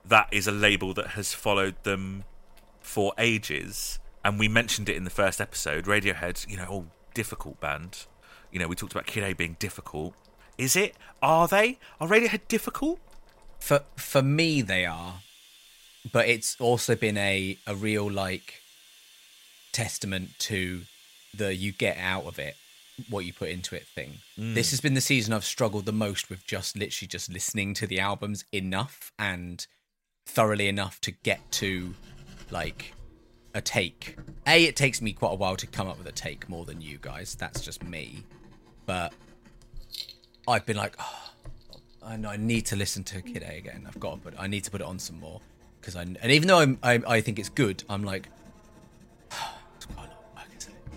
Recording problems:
household noises; faint; throughout; 25 dB below the speech

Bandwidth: 16 kHz